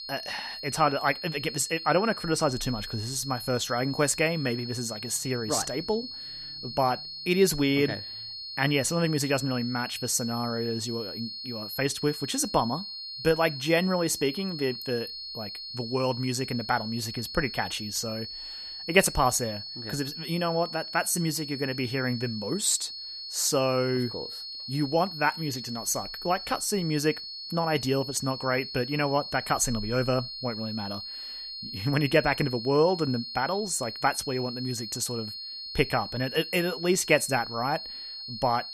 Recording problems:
high-pitched whine; loud; throughout; 4.5 kHz, 8 dB below the speech

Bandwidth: 14.5 kHz